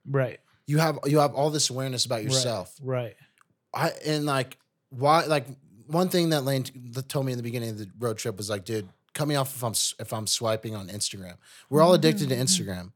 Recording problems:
none

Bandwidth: 18 kHz